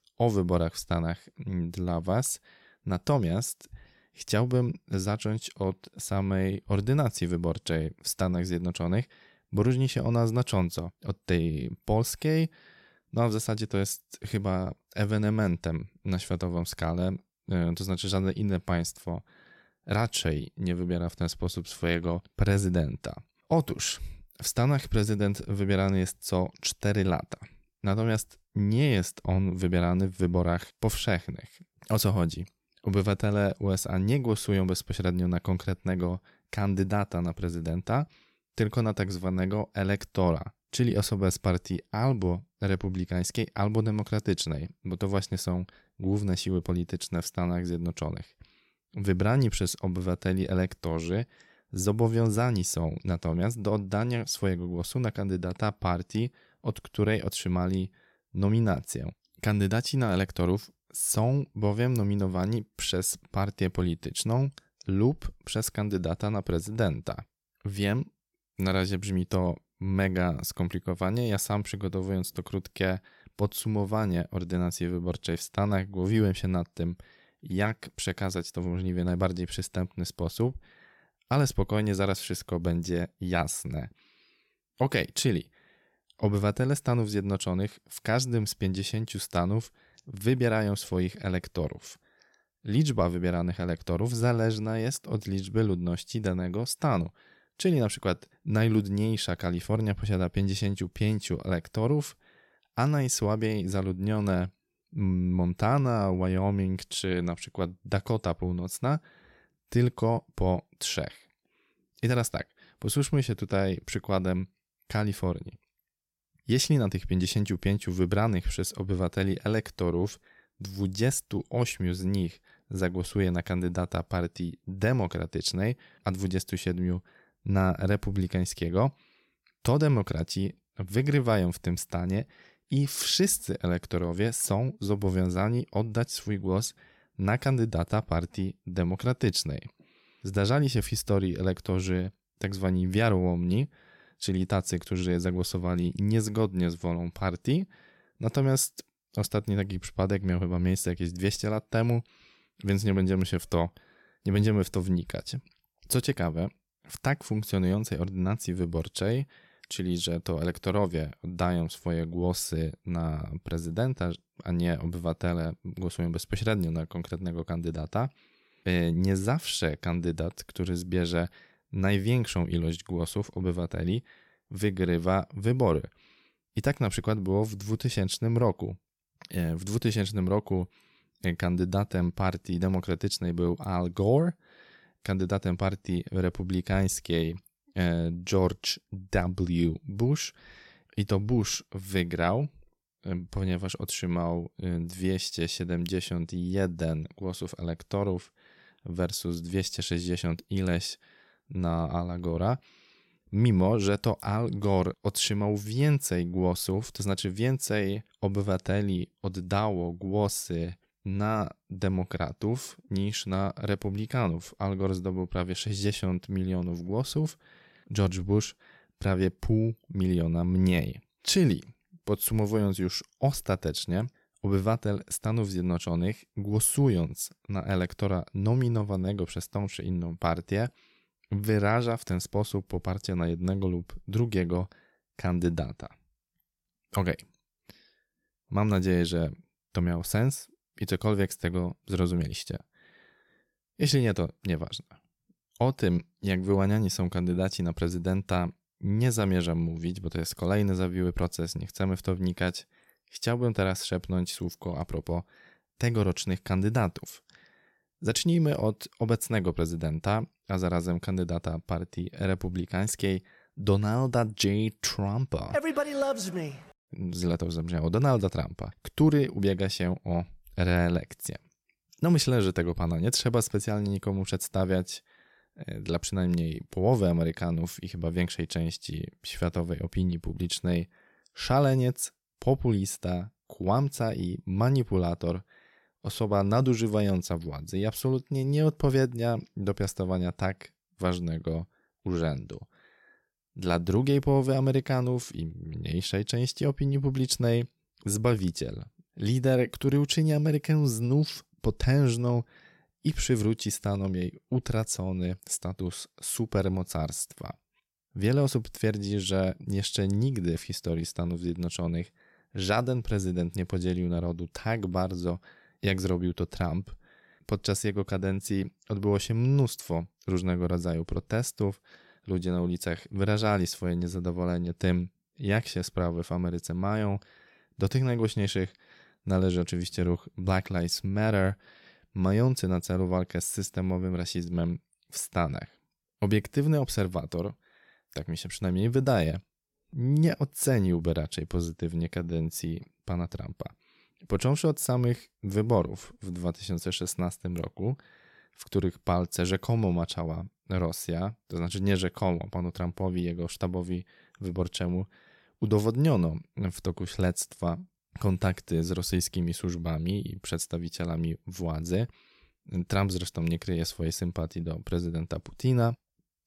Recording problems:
none

